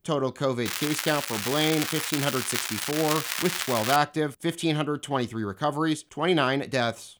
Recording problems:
crackling; loud; from 0.5 to 4 s; 2 dB below the speech

